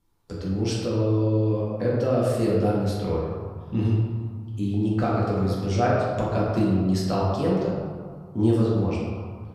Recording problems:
off-mic speech; far
room echo; noticeable; dies away in 1.7 s

